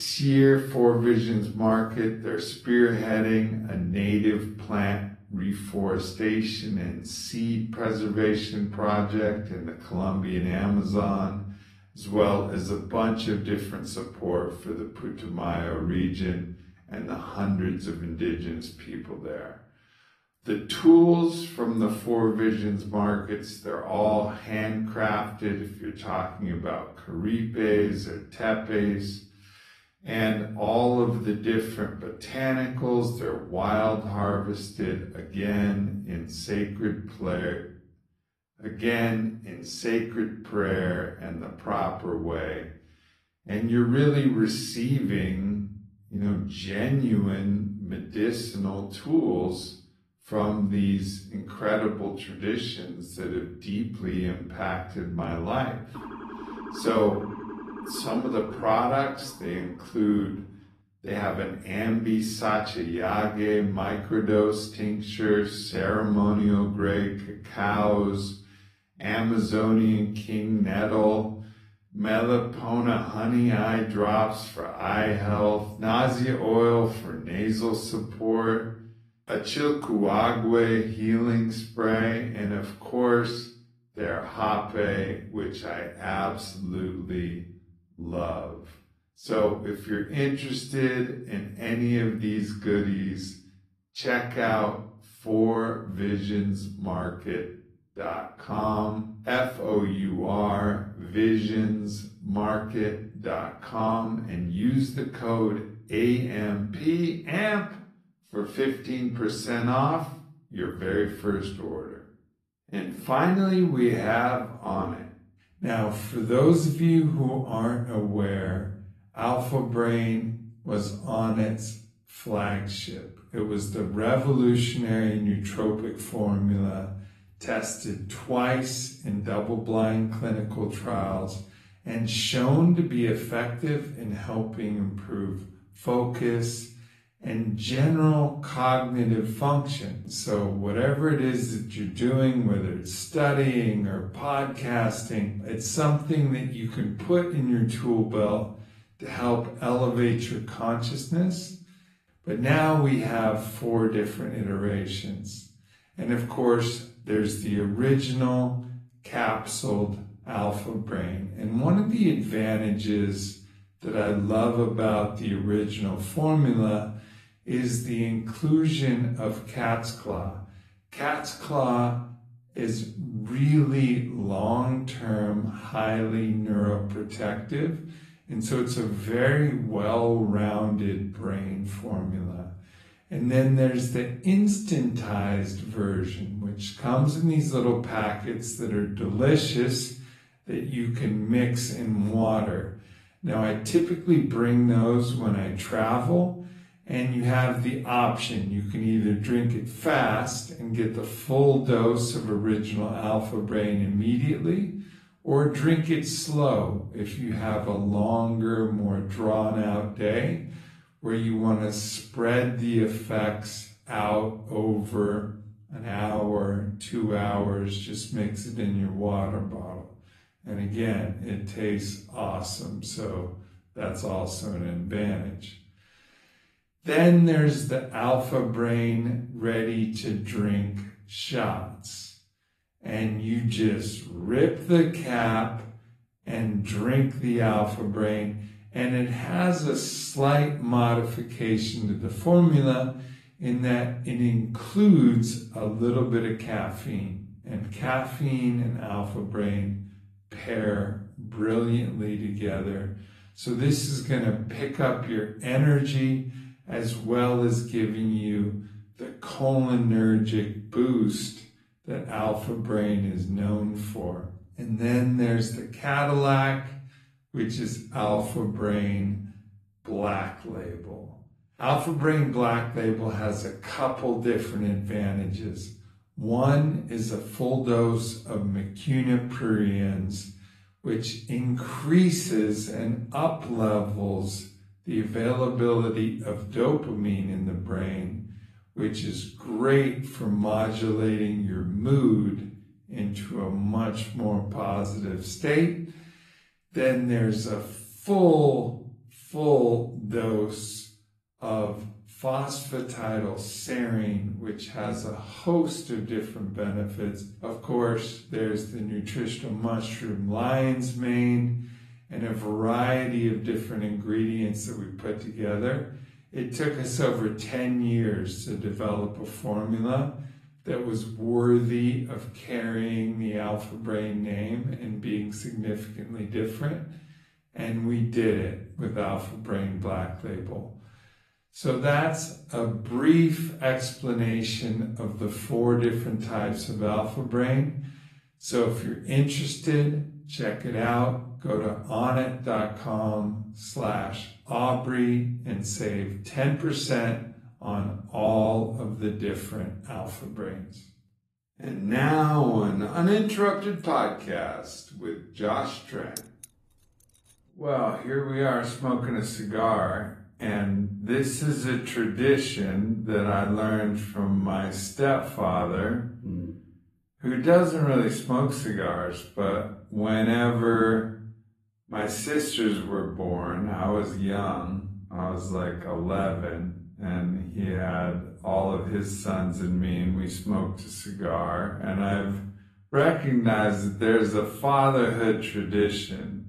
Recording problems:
wrong speed, natural pitch; too slow; 0.6 times normal speed
room echo; slight; dies away in 0.5 s
off-mic speech; somewhat distant
garbled, watery; slightly; nothing above 14 kHz
abrupt cut into speech; at the start
siren; faint; from 56 s to 1:00; peak 10 dB below the speech
jangling keys; faint; at 5:56; peak 15 dB below the speech

